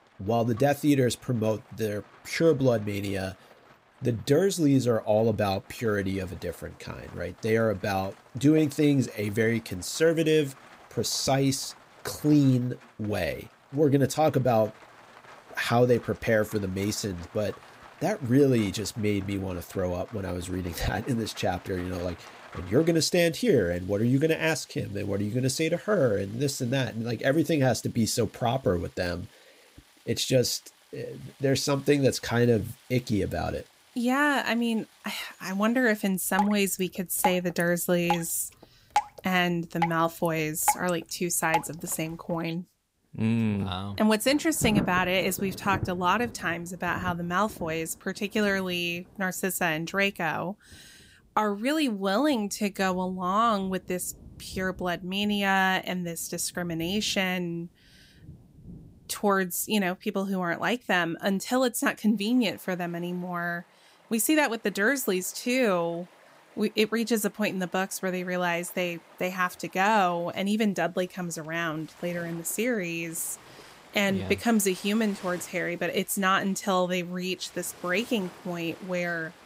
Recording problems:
rain or running water; noticeable; throughout; 15 dB below the speech

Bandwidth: 15.5 kHz